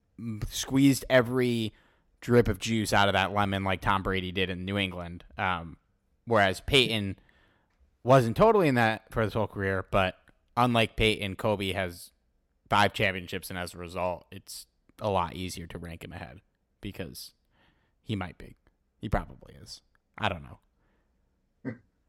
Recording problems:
none

